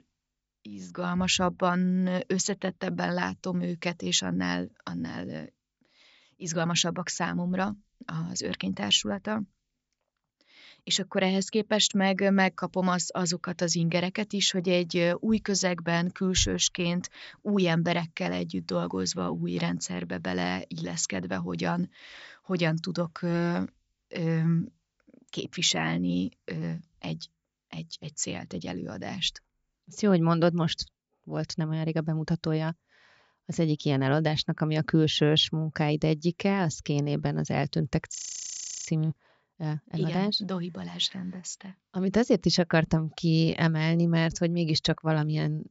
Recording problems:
high frequencies cut off; noticeable; nothing above 7.5 kHz
audio freezing; at 38 s for 0.5 s

